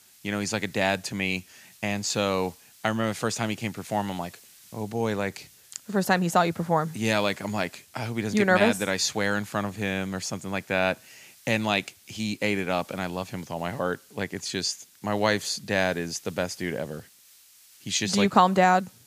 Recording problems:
hiss; faint; throughout; 25 dB below the speech

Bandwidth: 15 kHz